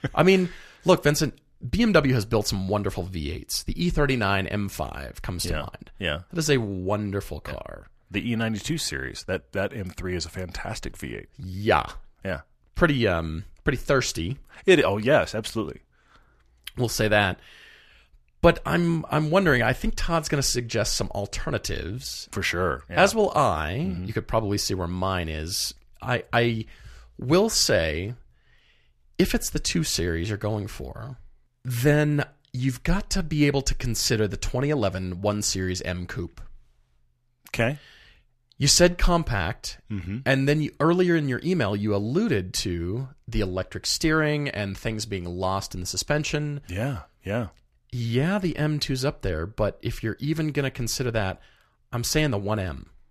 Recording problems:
none

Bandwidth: 14.5 kHz